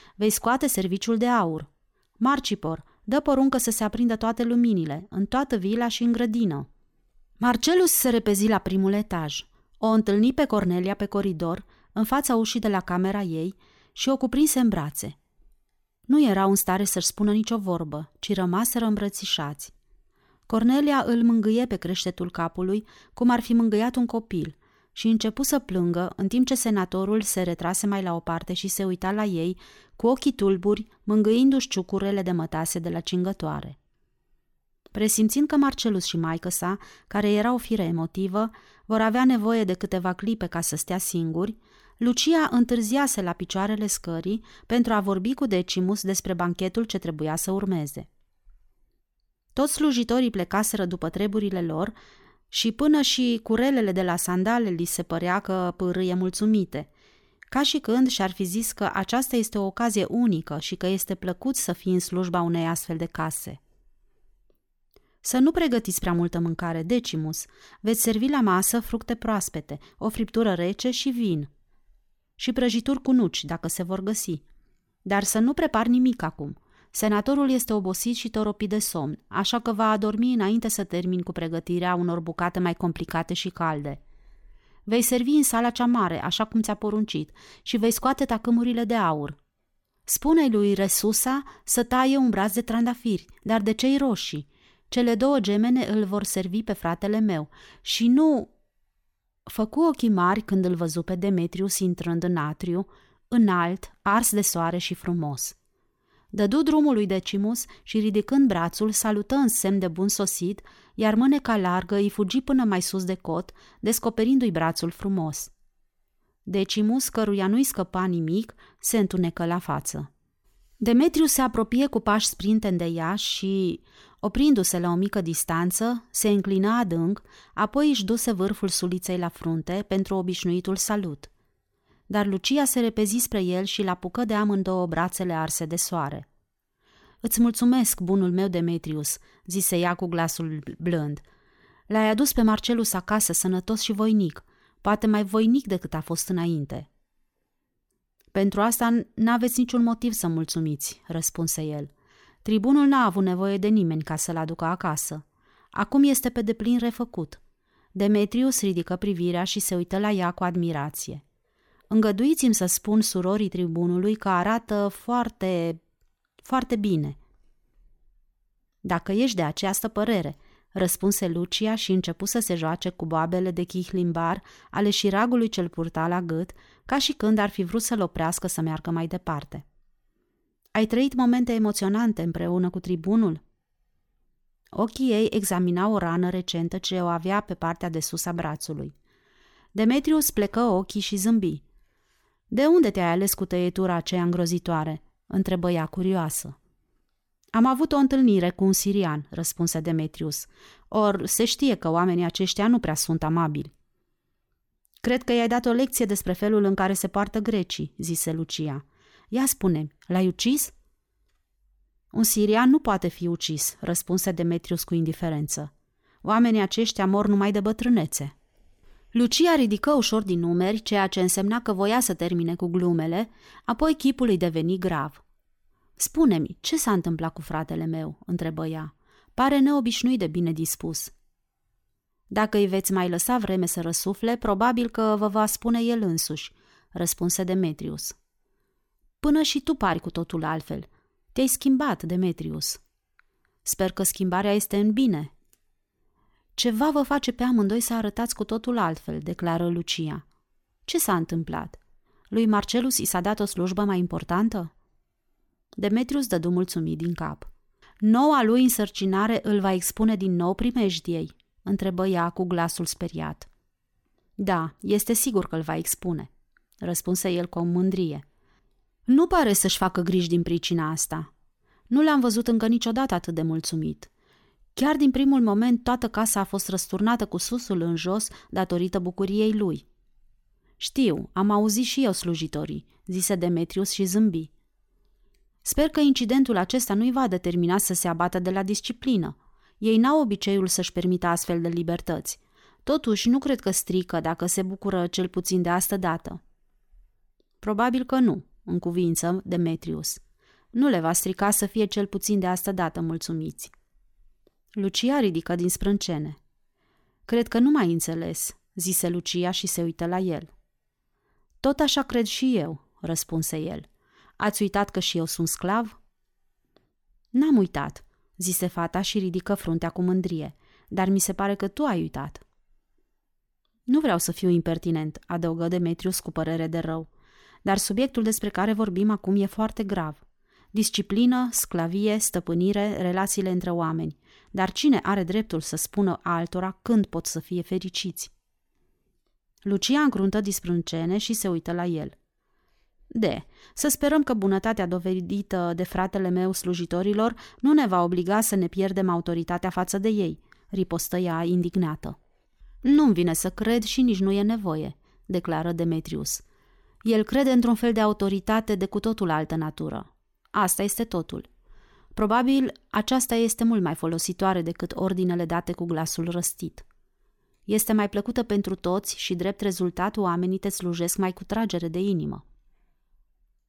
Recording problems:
none

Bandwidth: 18 kHz